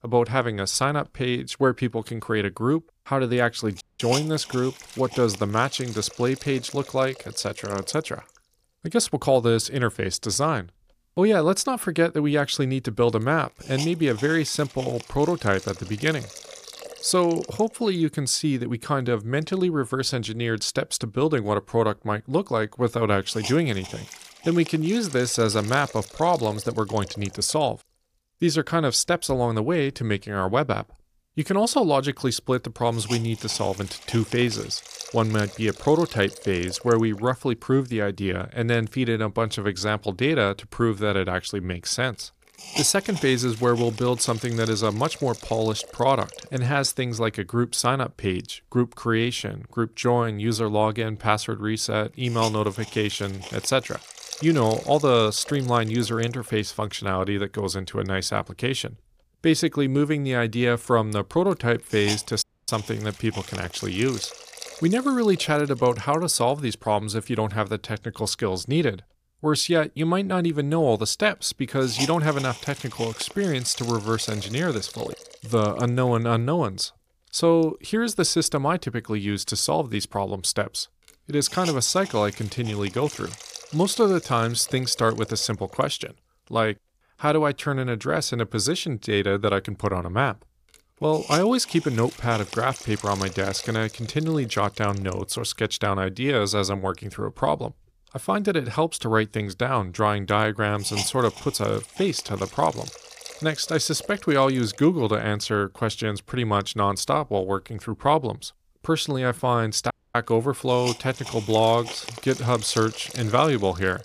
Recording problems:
hiss; noticeable; throughout; 15 dB below the speech
audio cutting out; at 4 s, at 1:02 and at 1:50

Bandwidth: 15 kHz